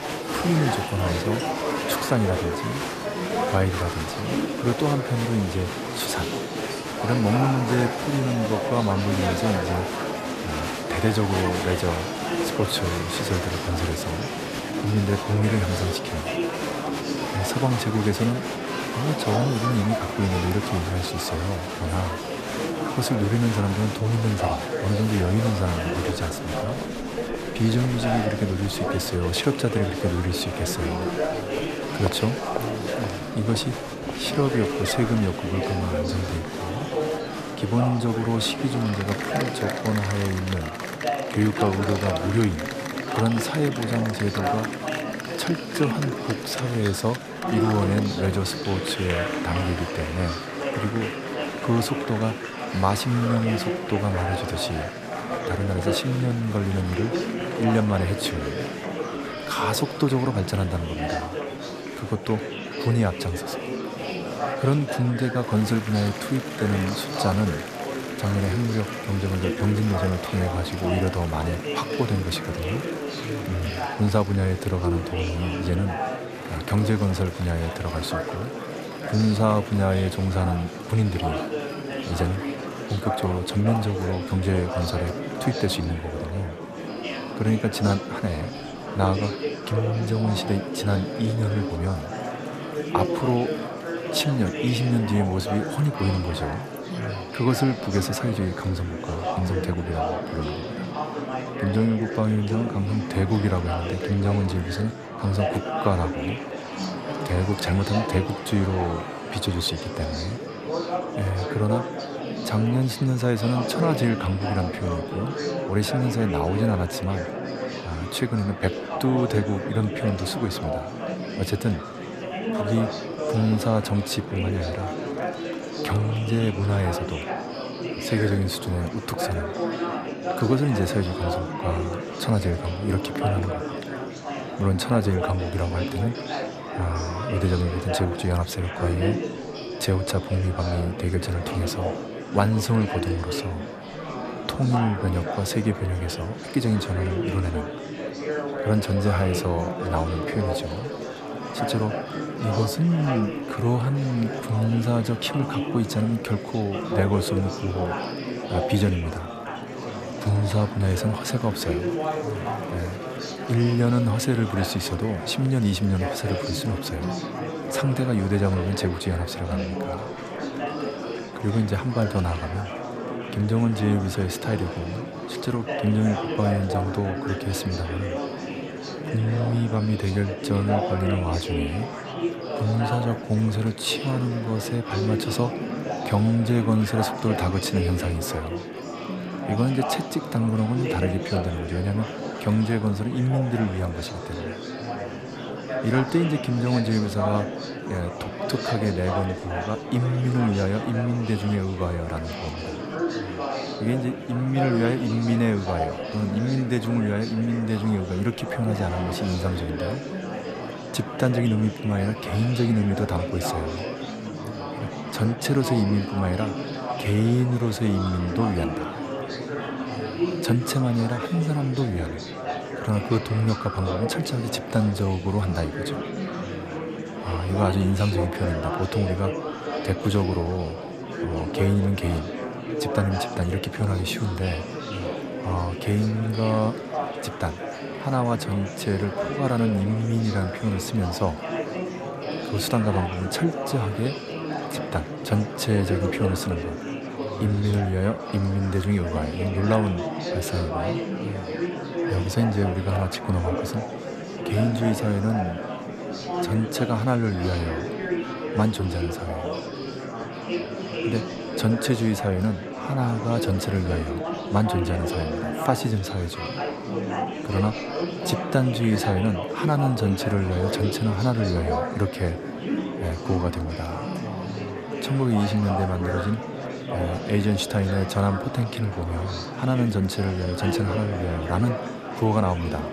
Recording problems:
murmuring crowd; loud; throughout; 4 dB below the speech

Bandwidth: 14.5 kHz